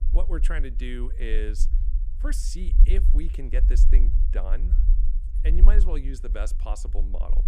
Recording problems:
low rumble; loud; throughout; 9 dB below the speech

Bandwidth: 15 kHz